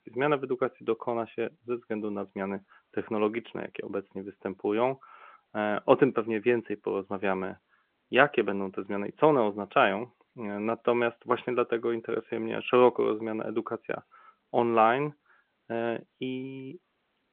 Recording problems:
phone-call audio

